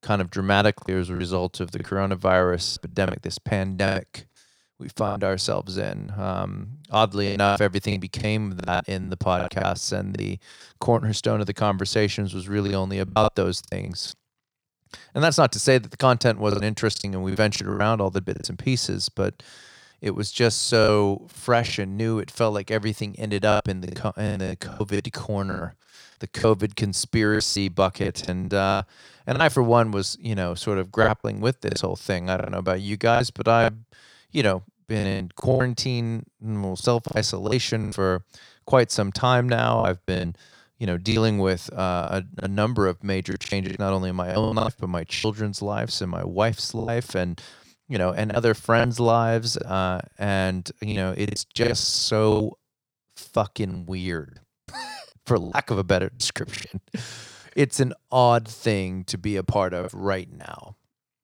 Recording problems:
choppy; very; 10% of the speech affected

